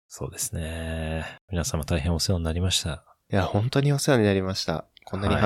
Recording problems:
abrupt cut into speech; at the end

